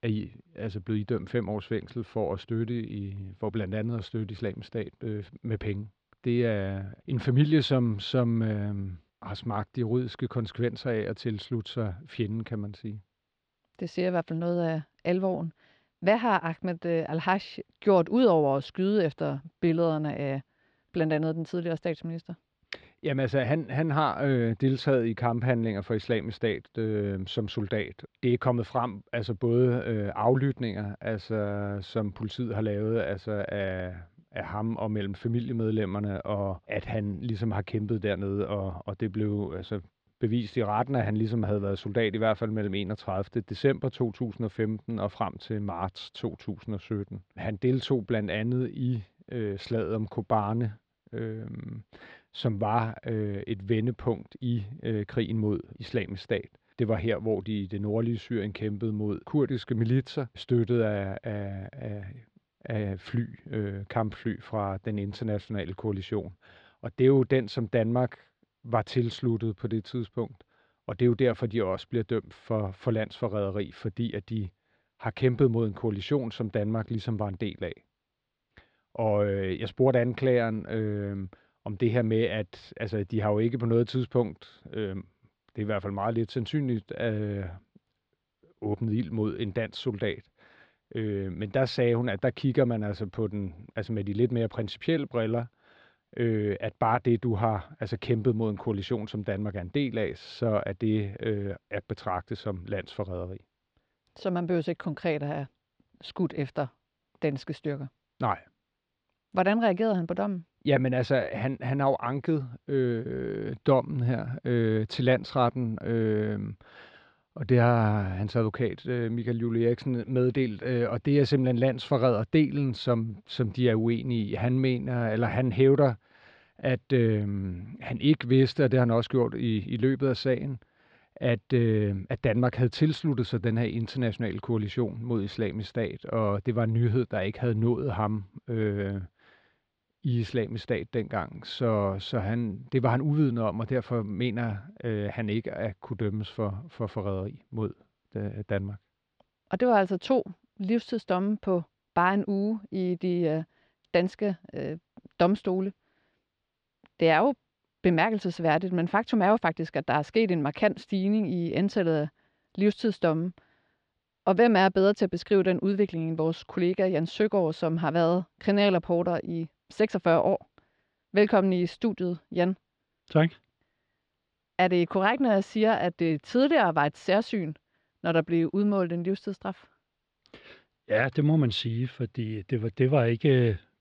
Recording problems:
muffled; very slightly; fading above 4 kHz

